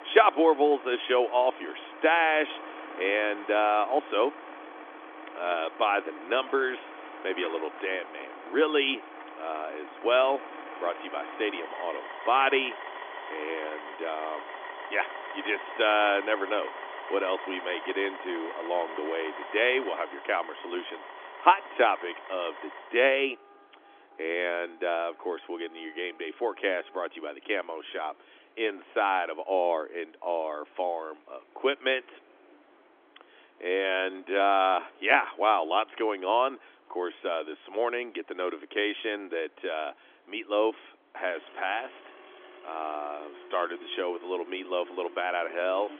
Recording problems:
phone-call audio; nothing above 3.5 kHz
traffic noise; noticeable; throughout; 15 dB below the speech

